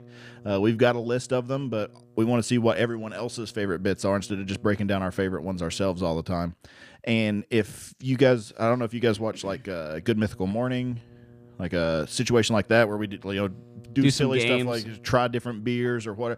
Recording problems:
electrical hum; faint; until 6 s and from 9.5 s on; 60 Hz, 30 dB below the speech

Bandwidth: 15 kHz